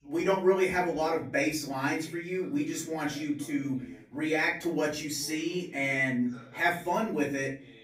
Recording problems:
off-mic speech; far
room echo; slight; dies away in 0.4 s
voice in the background; faint; throughout; 20 dB below the speech

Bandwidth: 15.5 kHz